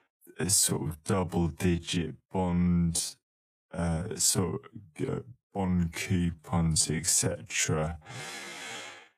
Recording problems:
wrong speed, natural pitch; too slow; 0.5 times normal speed

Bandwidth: 15 kHz